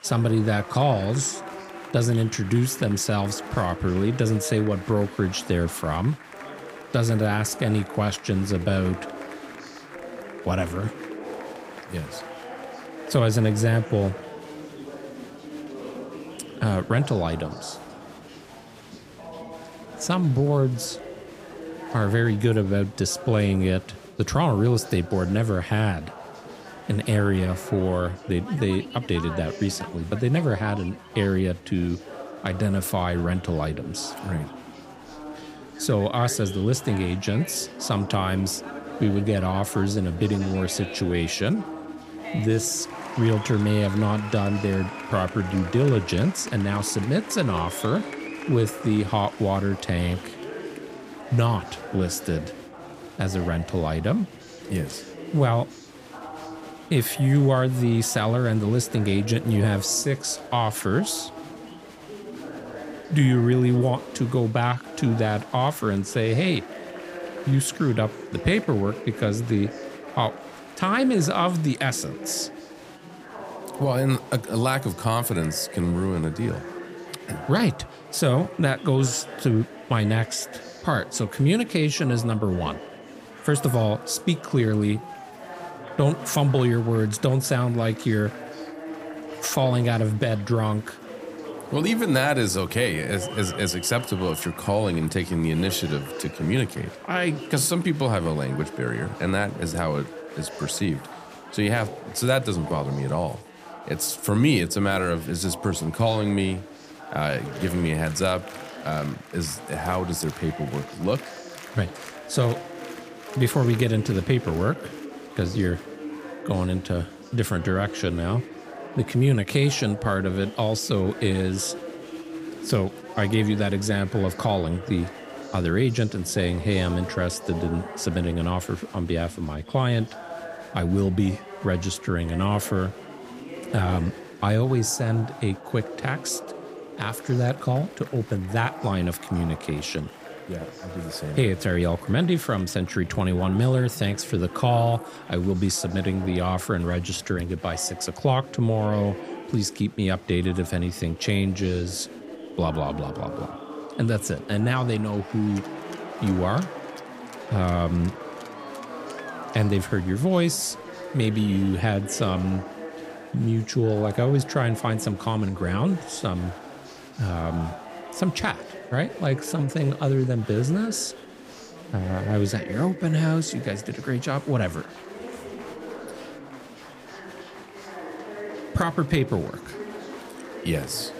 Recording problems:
chatter from many people; noticeable; throughout; 15 dB below the speech

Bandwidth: 15 kHz